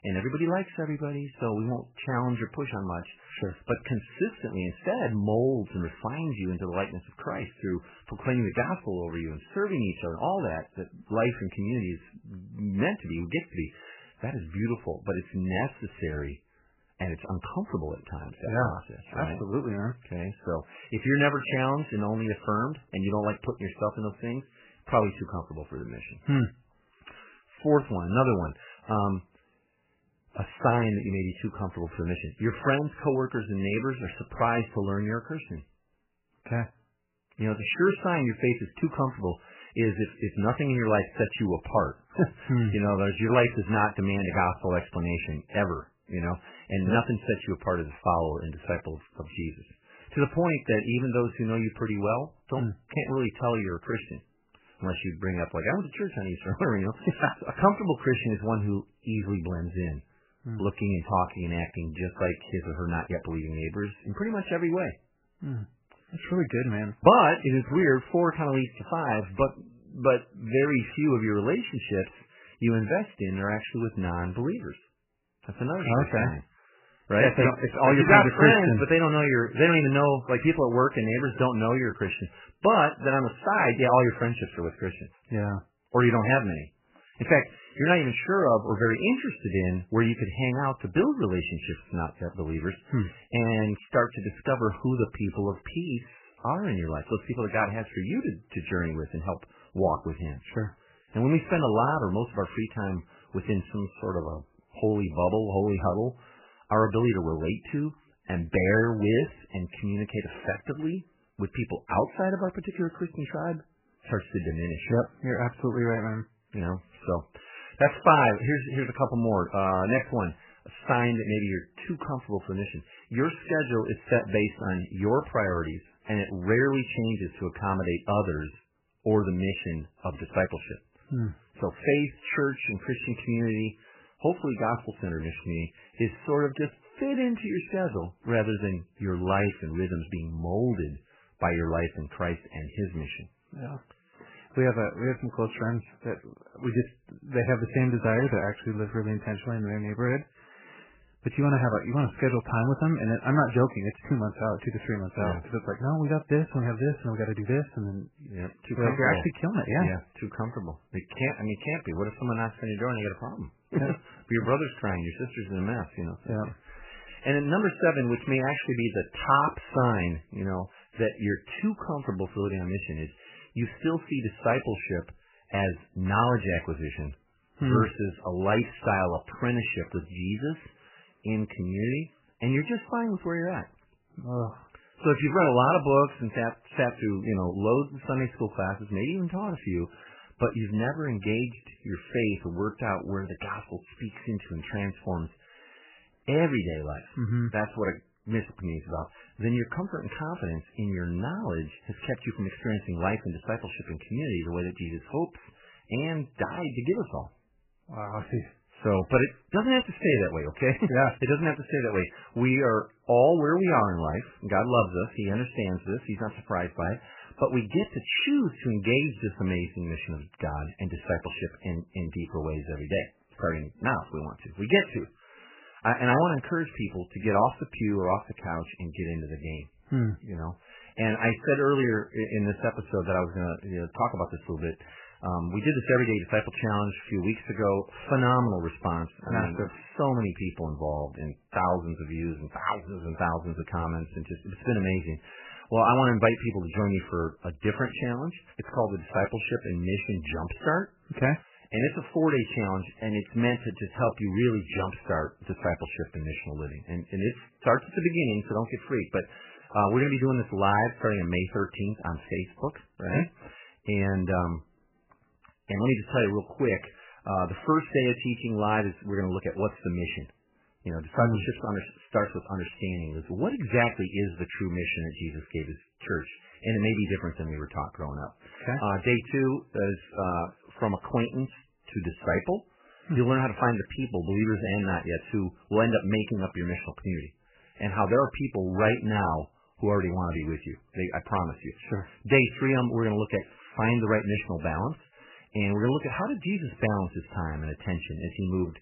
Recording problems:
garbled, watery; badly; nothing above 3 kHz

